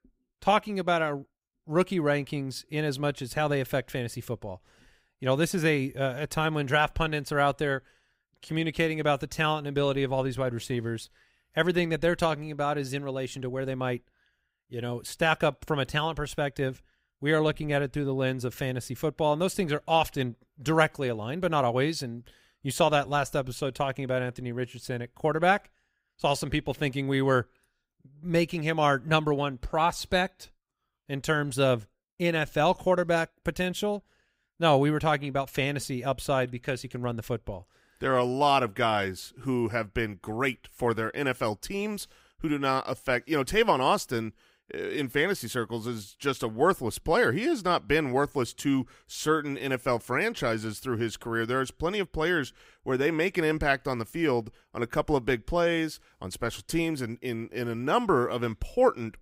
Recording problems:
none

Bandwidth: 15.5 kHz